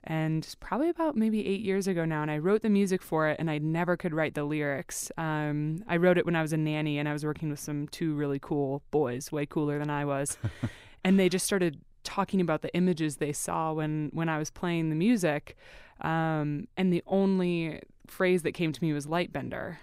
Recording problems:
none

